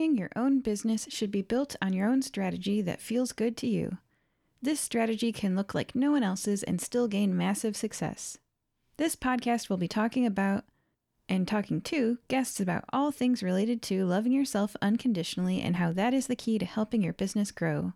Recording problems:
abrupt cut into speech; at the start

